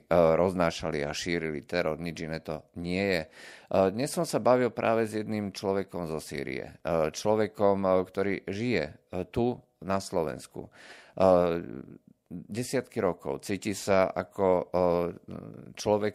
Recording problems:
none

